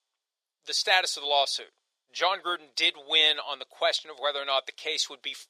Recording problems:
thin; very; fading below 450 Hz

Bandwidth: 14.5 kHz